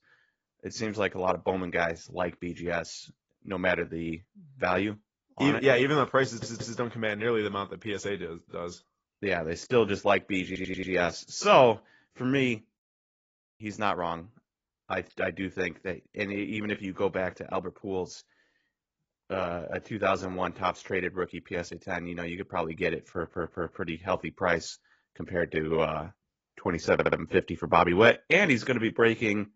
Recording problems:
garbled, watery; badly; nothing above 7.5 kHz
audio stuttering; 4 times, first at 6.5 s
audio cutting out; at 13 s for 1 s

